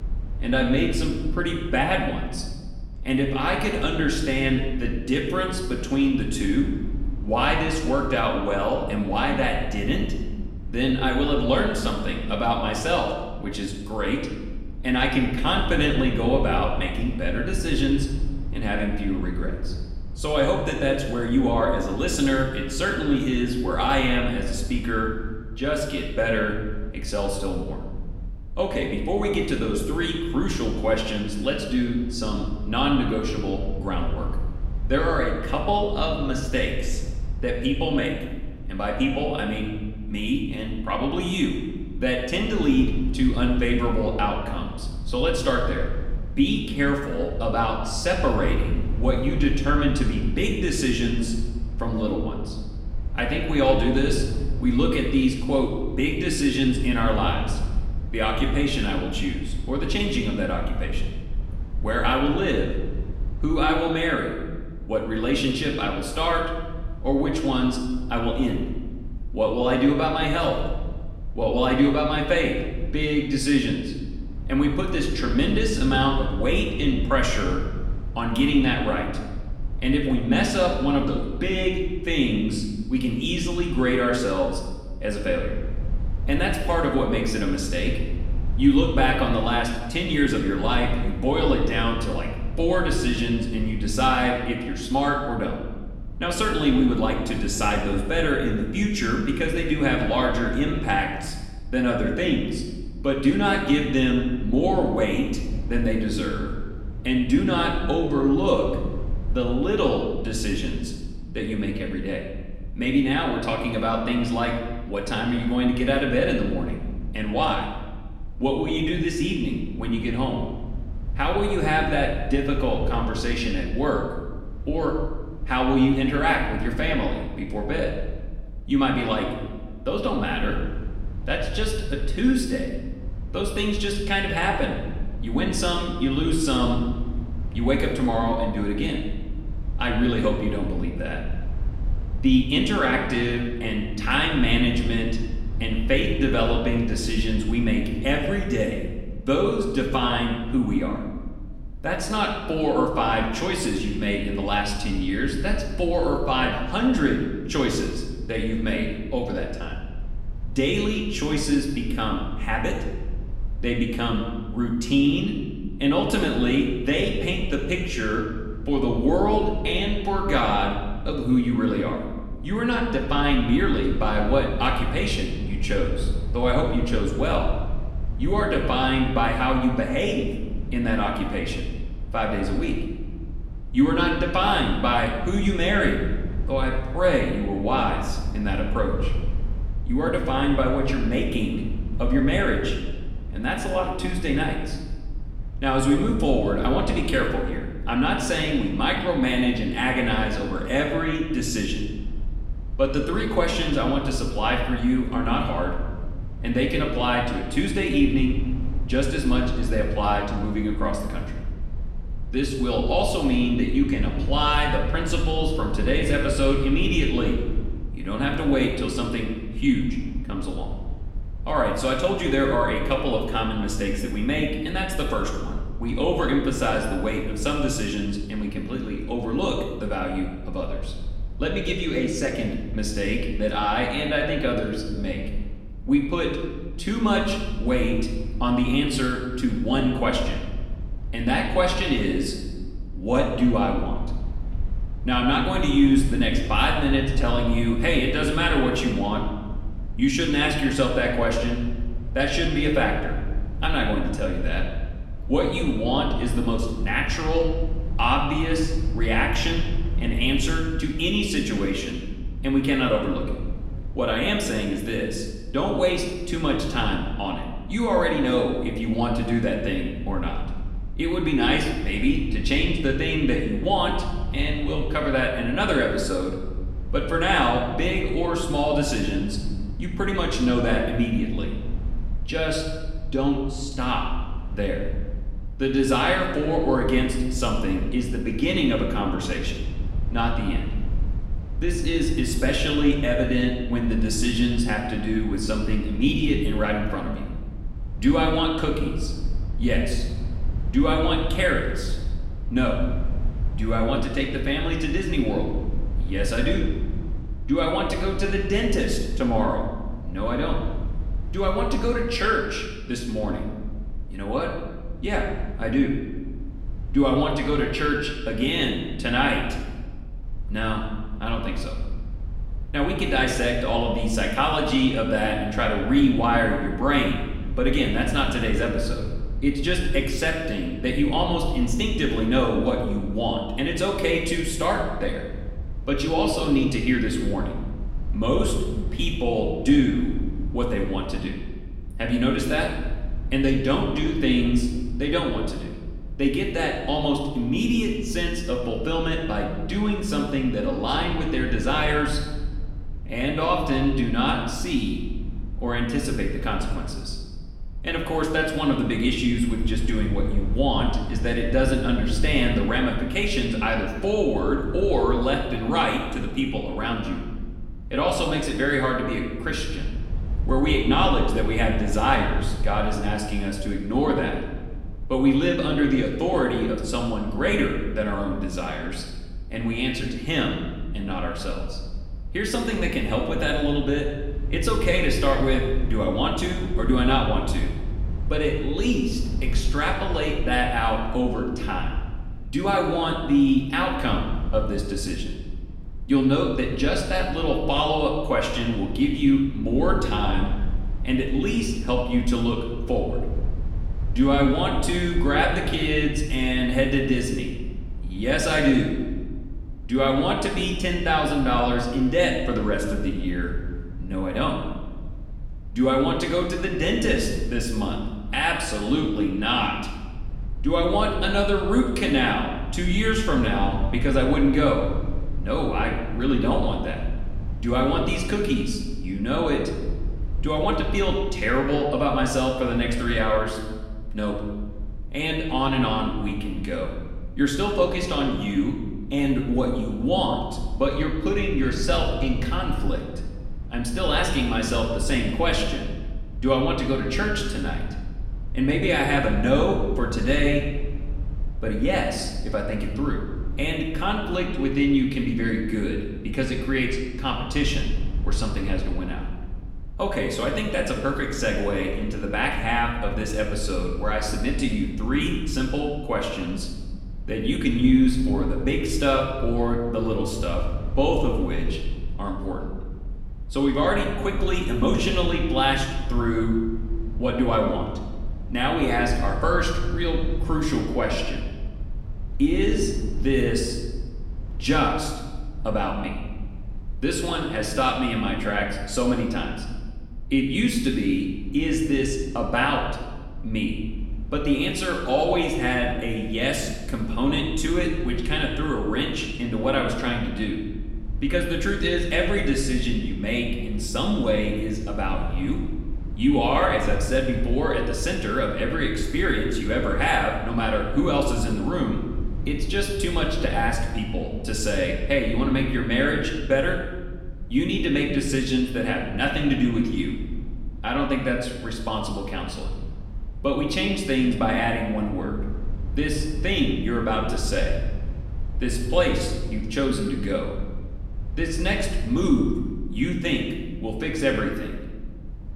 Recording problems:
off-mic speech; far
room echo; noticeable; dies away in 1.1 s
low rumble; faint; throughout; 25 dB below the speech

